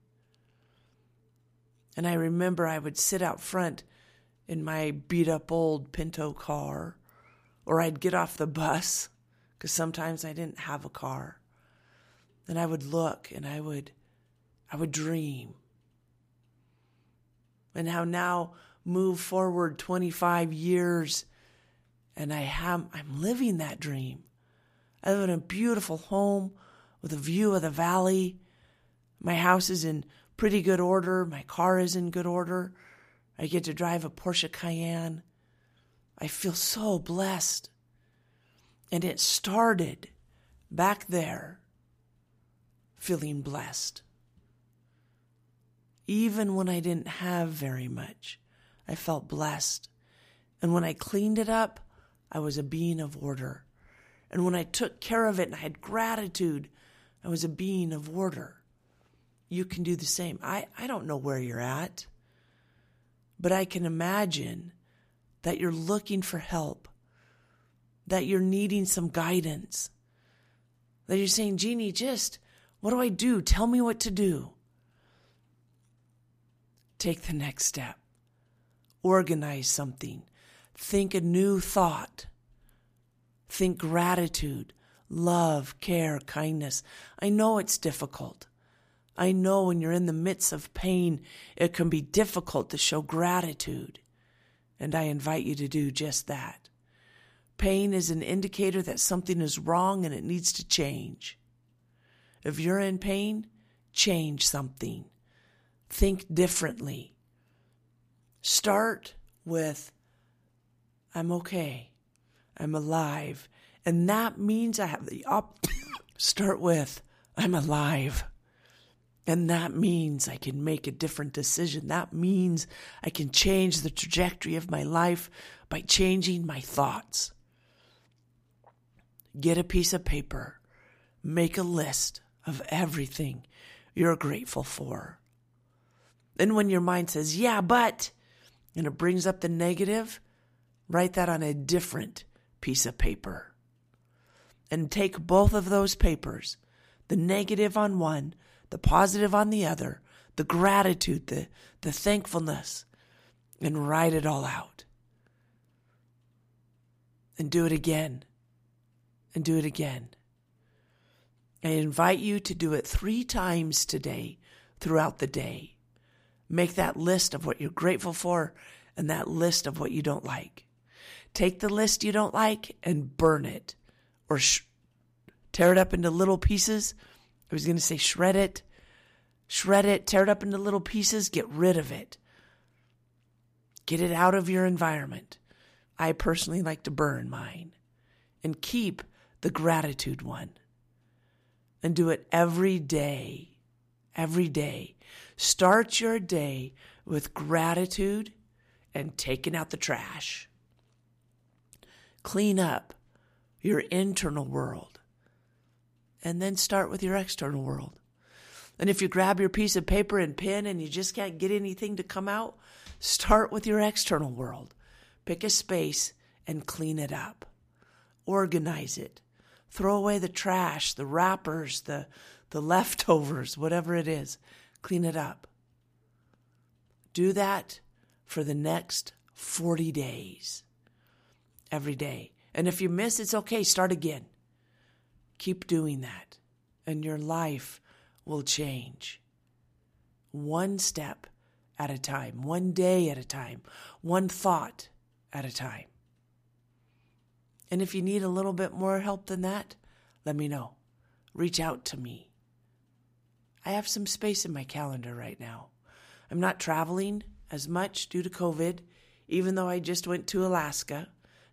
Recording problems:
none

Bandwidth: 15 kHz